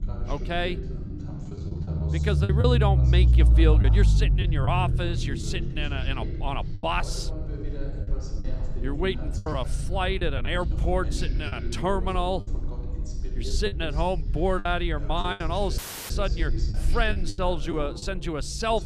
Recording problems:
voice in the background; noticeable; throughout; 10 dB below the speech
low rumble; noticeable; throughout; 15 dB below the speech
choppy; very; 6% of the speech affected
audio cutting out; at 16 s

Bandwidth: 14.5 kHz